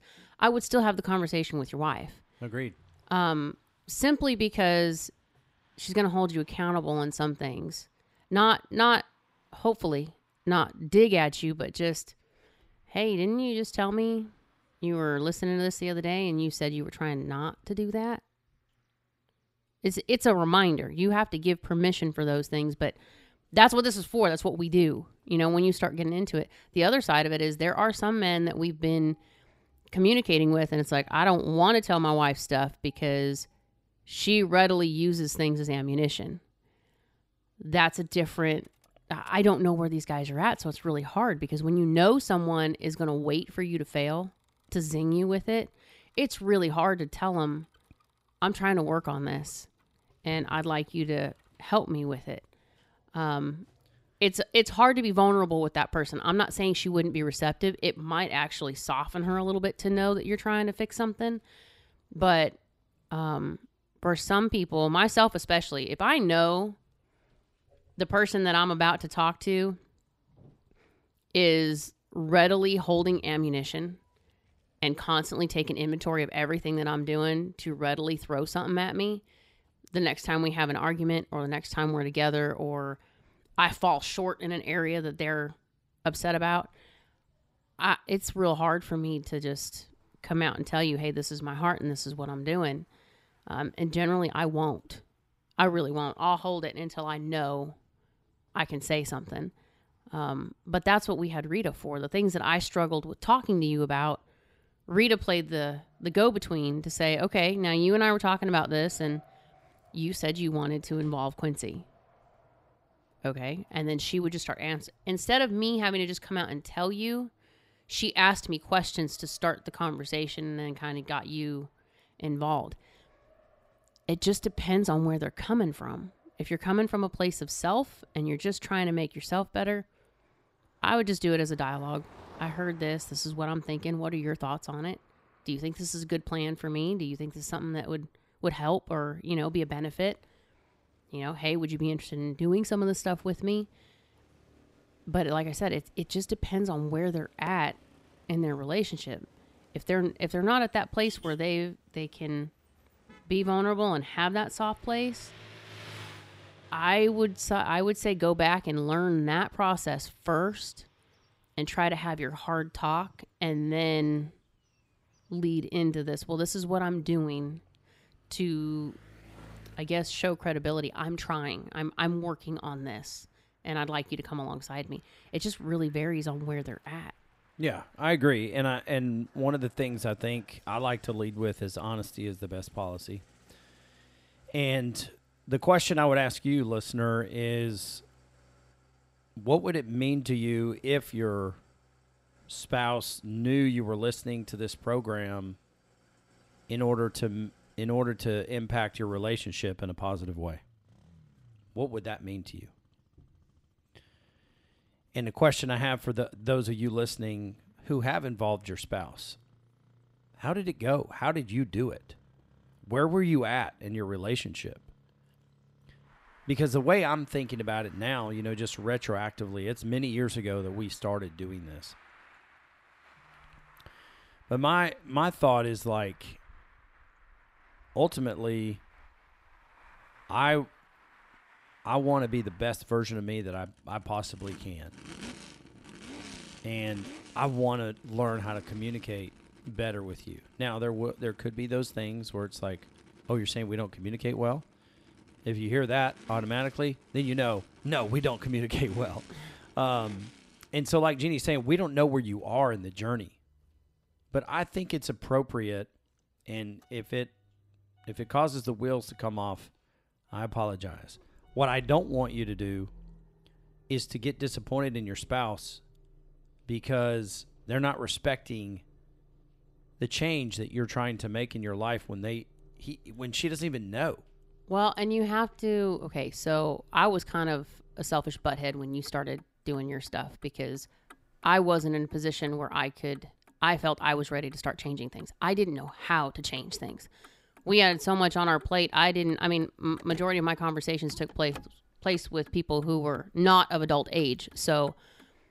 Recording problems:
traffic noise; faint; throughout; 30 dB below the speech

